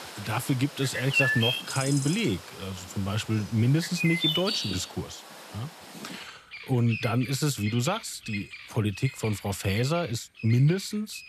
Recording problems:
animal sounds; loud; throughout; 4 dB below the speech

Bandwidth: 14.5 kHz